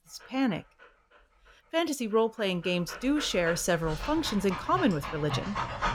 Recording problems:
animal sounds; loud; throughout; 9 dB below the speech

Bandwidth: 17 kHz